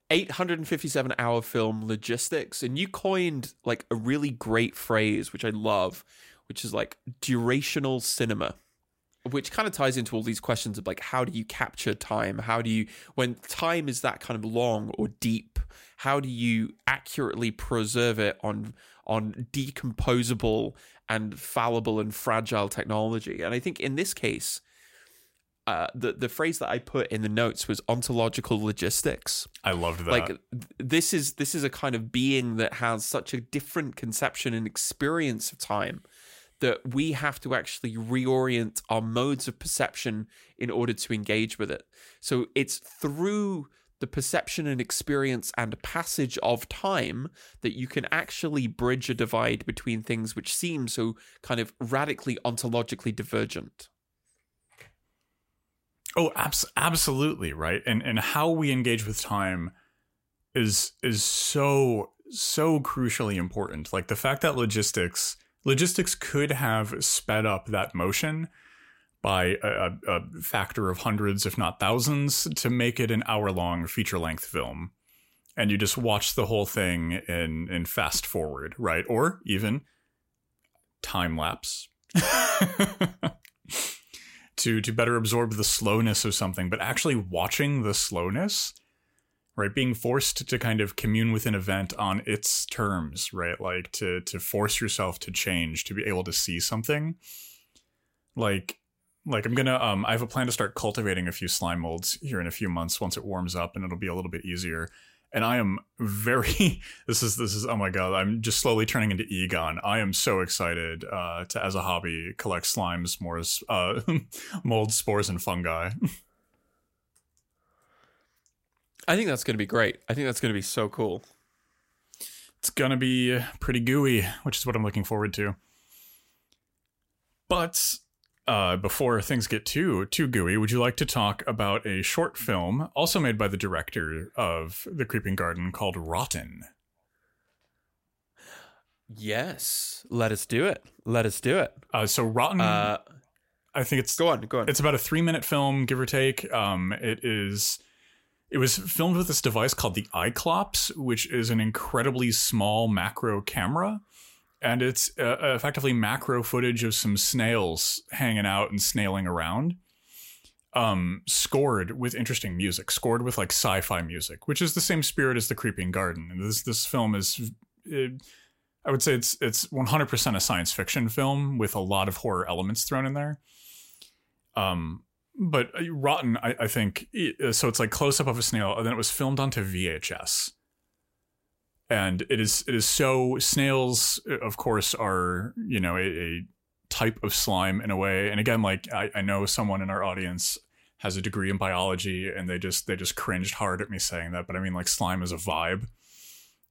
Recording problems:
none

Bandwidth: 16 kHz